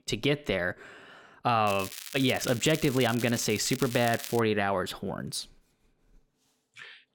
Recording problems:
crackling; noticeable; from 1.5 to 4.5 s; 10 dB below the speech

